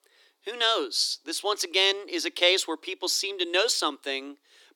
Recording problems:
thin; somewhat; fading below 300 Hz

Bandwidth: 17.5 kHz